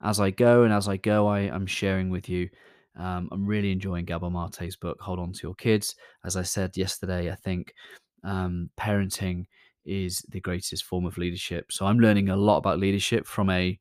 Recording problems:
none

